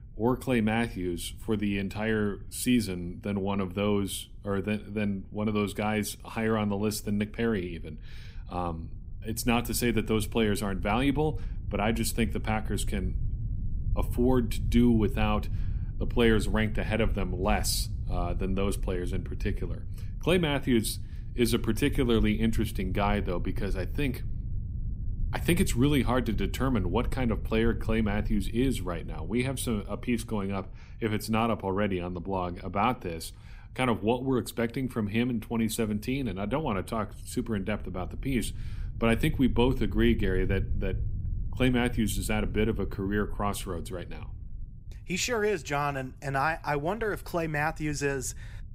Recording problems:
low rumble; faint; throughout; 20 dB below the speech

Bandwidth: 15.5 kHz